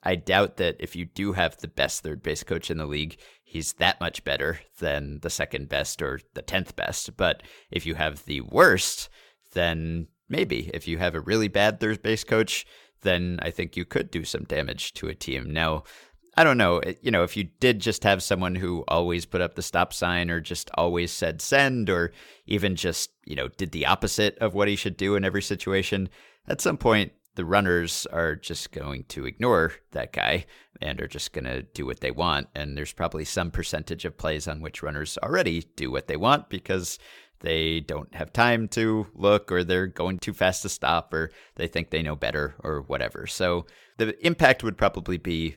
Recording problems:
none

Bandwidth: 17.5 kHz